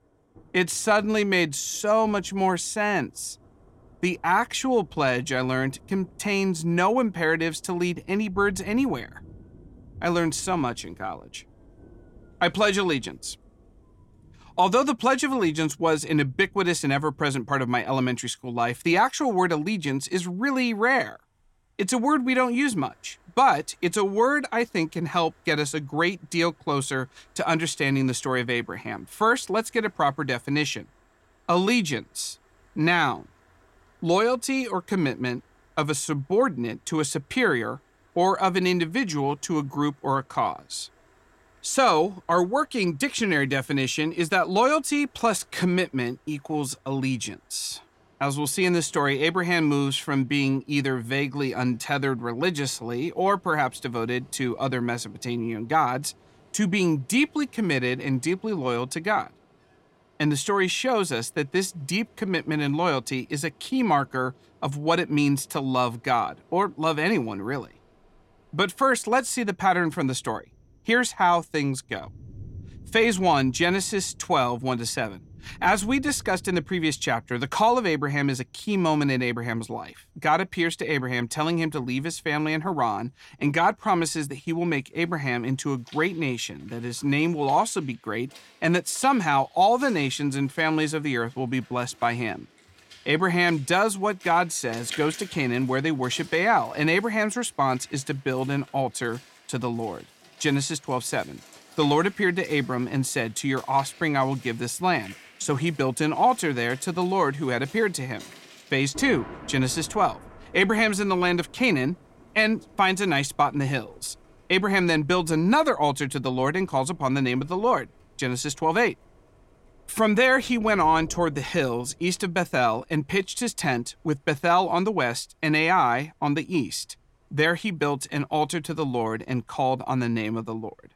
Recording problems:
rain or running water; faint; throughout; 25 dB below the speech

